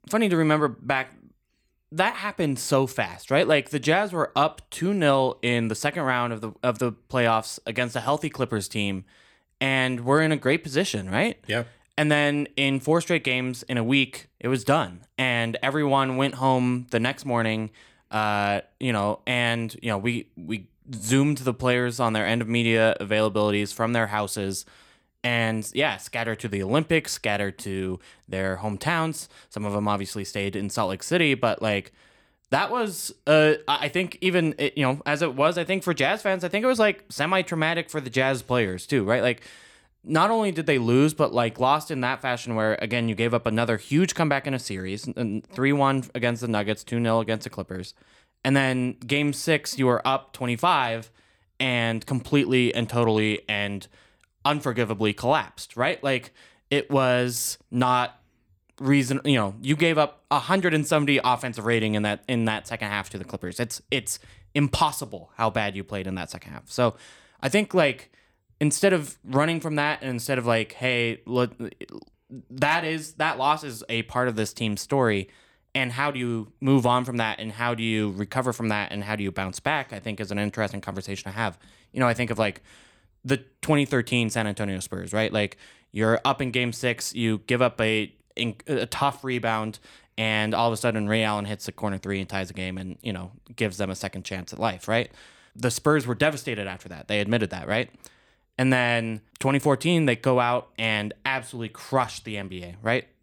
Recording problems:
none

